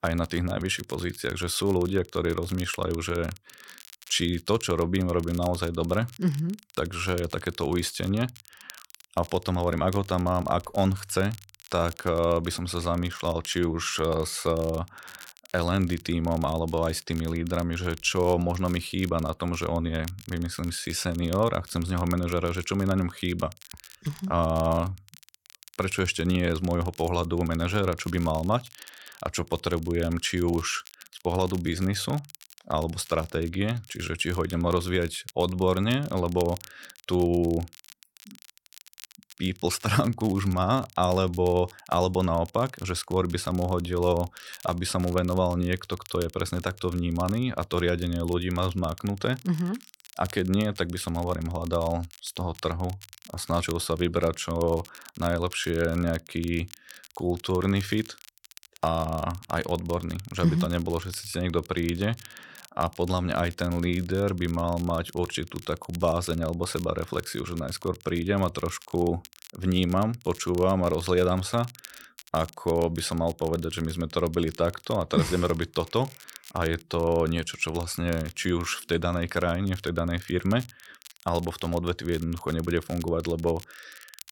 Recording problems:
crackle, like an old record; faint; 20 dB below the speech

